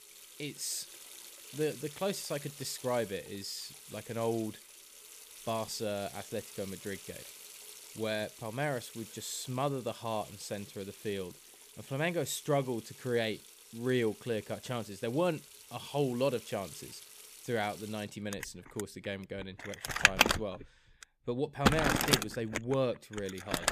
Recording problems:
household noises; very loud; throughout; 1 dB above the speech

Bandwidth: 14.5 kHz